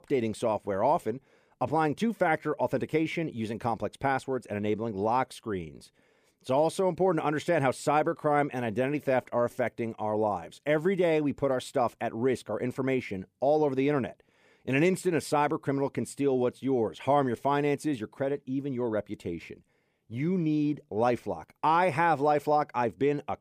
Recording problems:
none

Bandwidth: 15 kHz